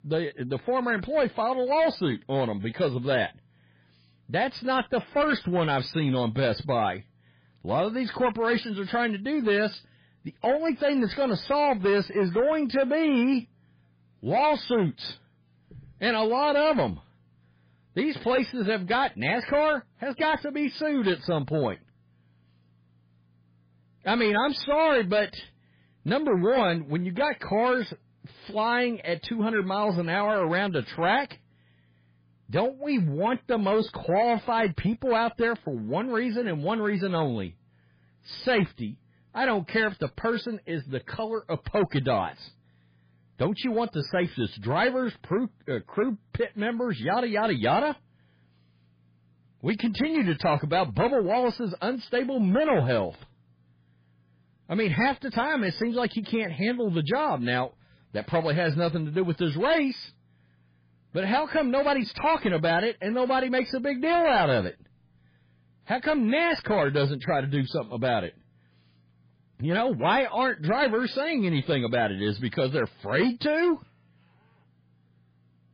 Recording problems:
garbled, watery; badly; nothing above 5 kHz
distortion; slight; 10 dB below the speech

